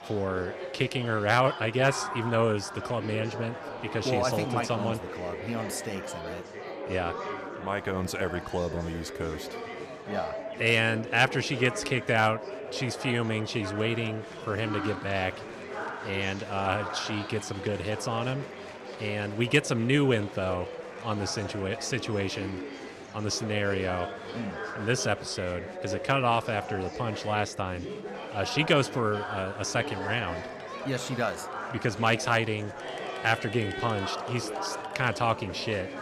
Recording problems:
chatter from many people; loud; throughout; 8 dB below the speech

